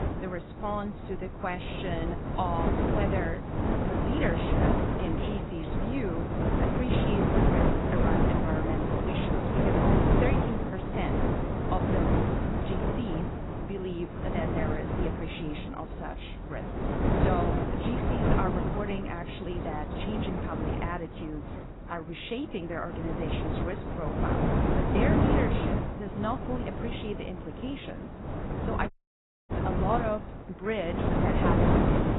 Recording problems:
garbled, watery; badly; nothing above 4 kHz
wind noise on the microphone; heavy; 3 dB above the speech
animal sounds; noticeable; until 22 s; 15 dB below the speech
audio cutting out; at 29 s for 0.5 s

